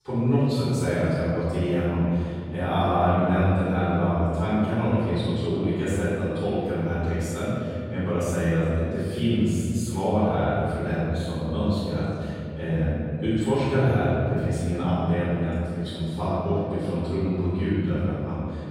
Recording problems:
room echo; strong; dies away in 2.9 s
off-mic speech; far

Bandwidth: 16 kHz